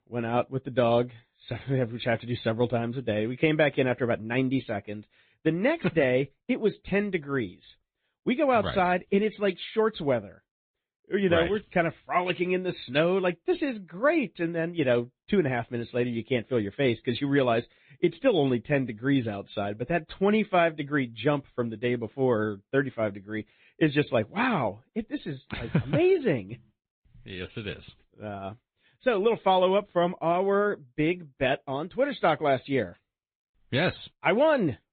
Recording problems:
high frequencies cut off; severe; nothing above 4 kHz
garbled, watery; slightly

